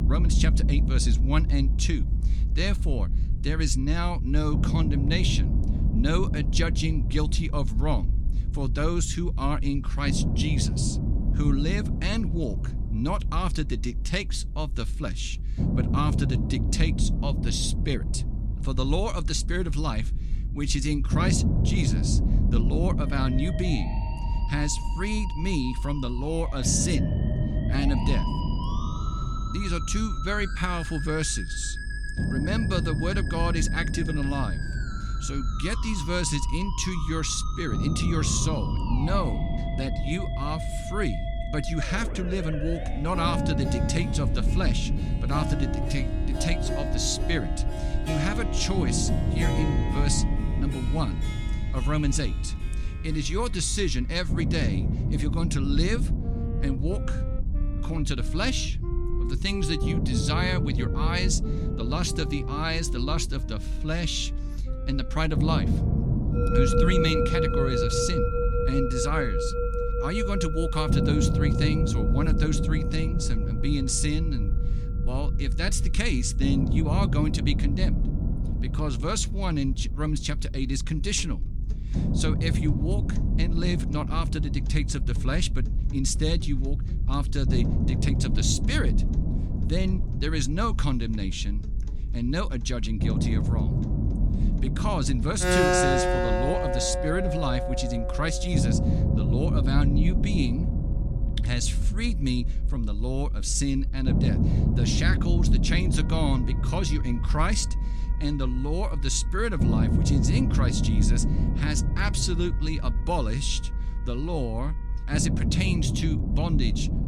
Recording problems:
background music; loud; throughout; 4 dB below the speech
low rumble; loud; throughout; 8 dB below the speech
electrical hum; faint; throughout; 50 Hz, 30 dB below the speech

